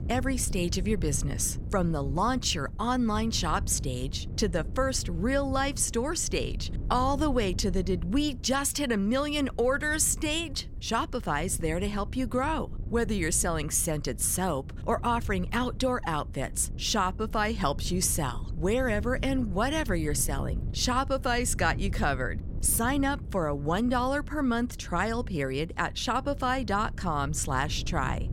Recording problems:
wind noise on the microphone; occasional gusts; 20 dB below the speech

